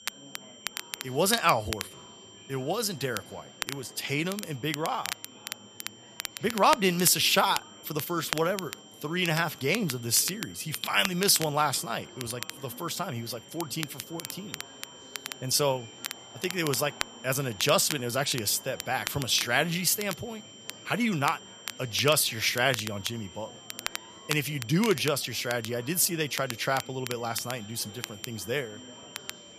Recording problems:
crackle, like an old record; noticeable; 10 dB below the speech
high-pitched whine; faint; throughout; 3 kHz, 20 dB below the speech
murmuring crowd; faint; throughout; 25 dB below the speech

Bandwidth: 14.5 kHz